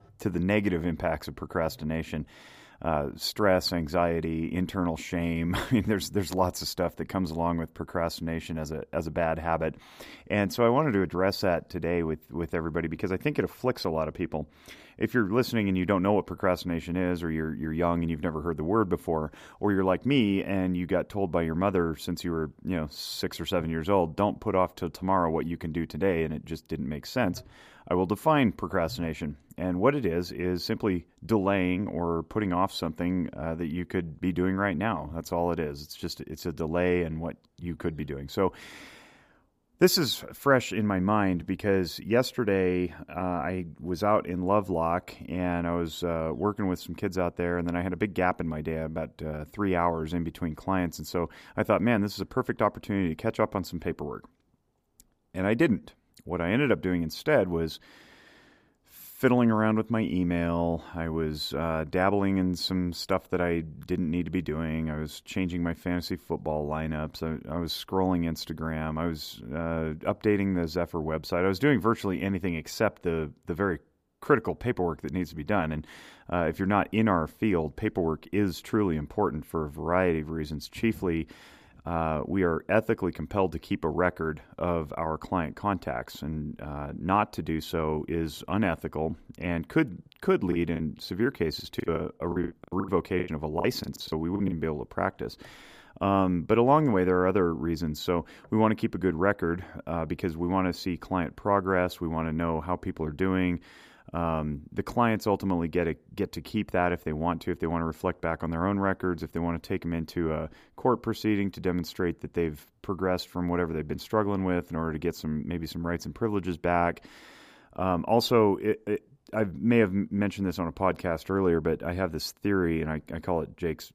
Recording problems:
choppy; very; from 1:31 to 1:35; 20% of the speech affected

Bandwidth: 15 kHz